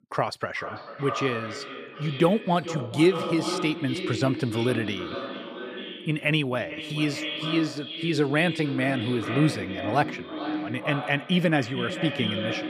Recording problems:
echo of what is said; strong; throughout; 440 ms later, 7 dB below the speech

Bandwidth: 15 kHz